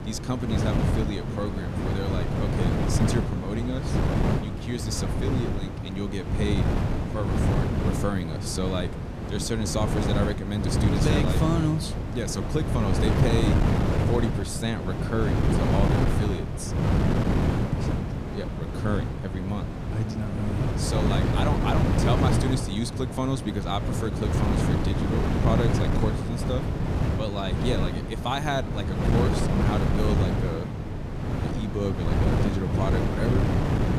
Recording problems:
wind noise on the microphone; heavy; as loud as the speech

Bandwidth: 14.5 kHz